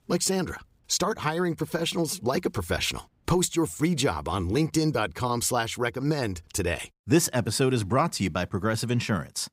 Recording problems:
none

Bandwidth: 15.5 kHz